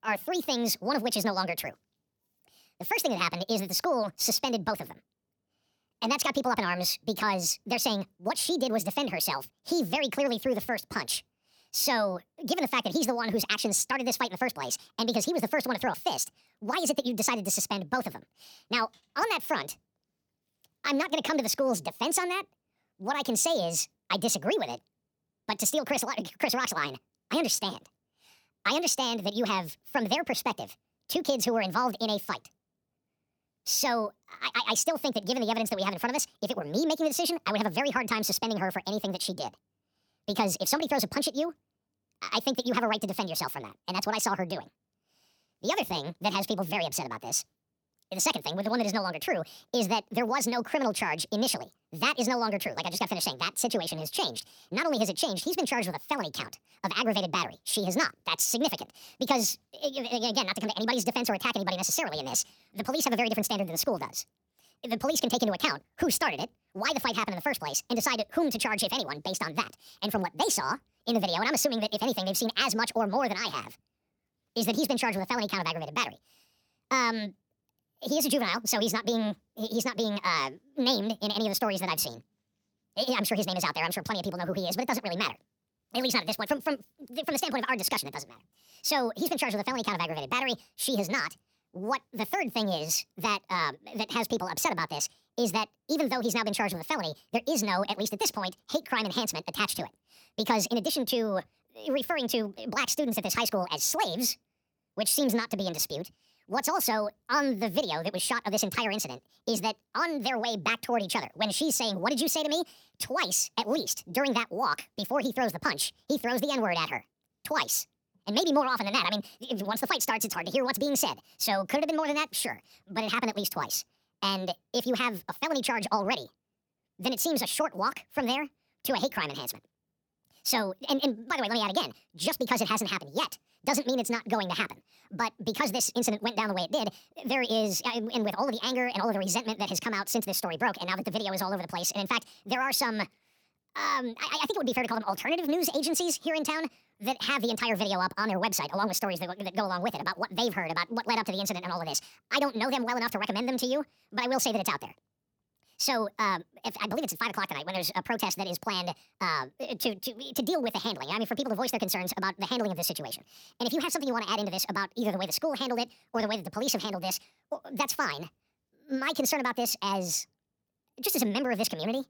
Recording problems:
wrong speed and pitch; too fast and too high; 1.6 times normal speed

